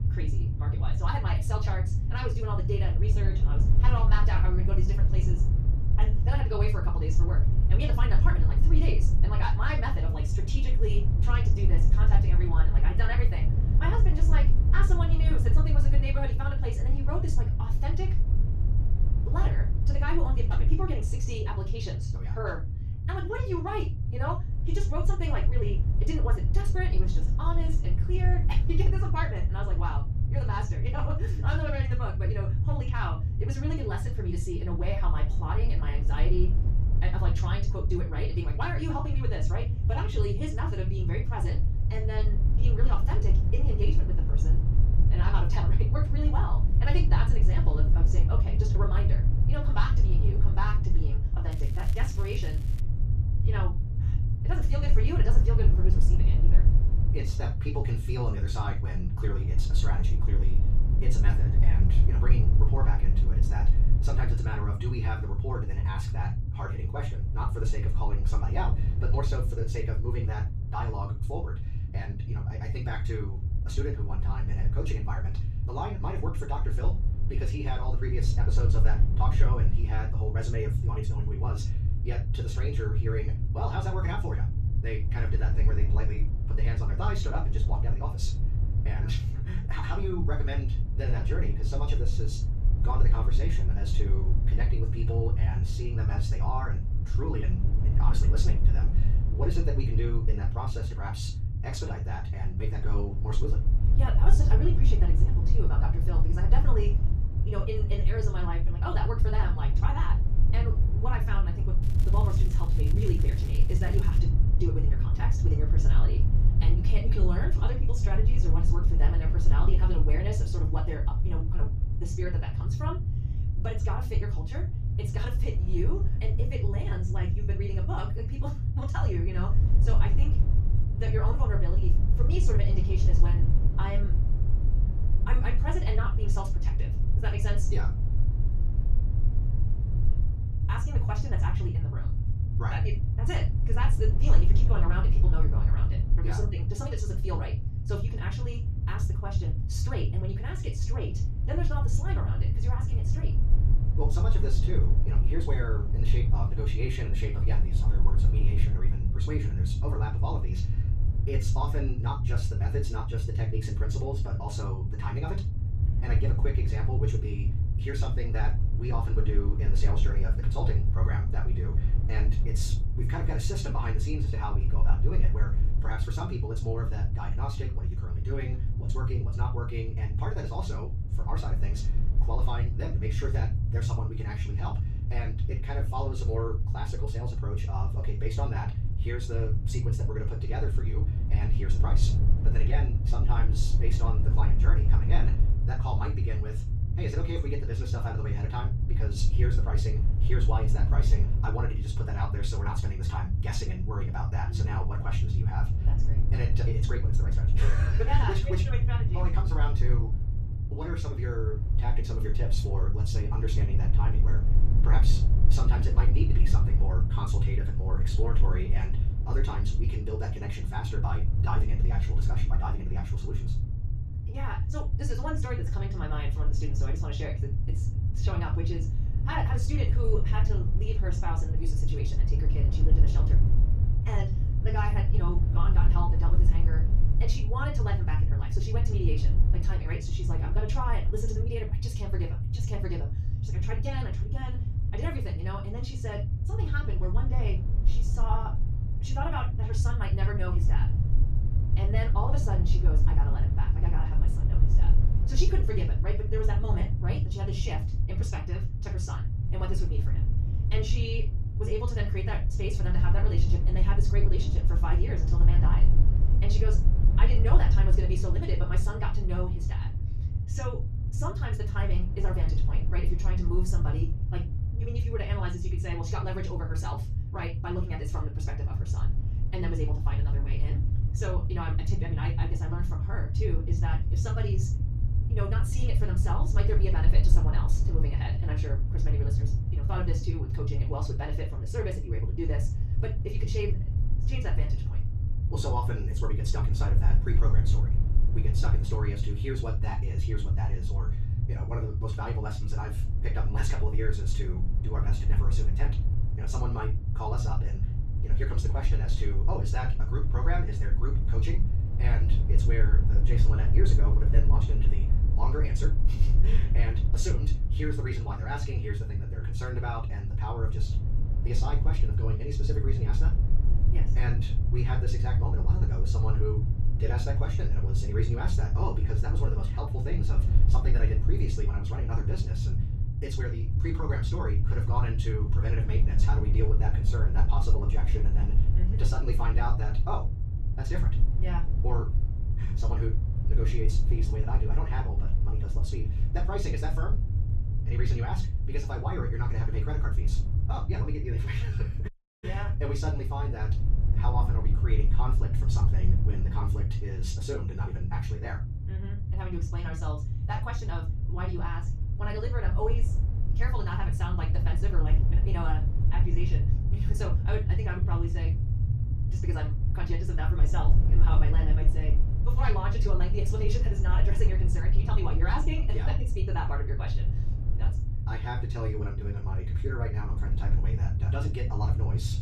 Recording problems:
off-mic speech; far
wrong speed, natural pitch; too fast; 1.5 times normal speed
room echo; slight; dies away in 0.2 s
low rumble; loud; throughout; 6 dB below the speech
crackling; noticeable; from 52 to 53 s and from 1:52 to 1:54; 15 dB below the speech
audio cutting out; at 5:52

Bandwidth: 14.5 kHz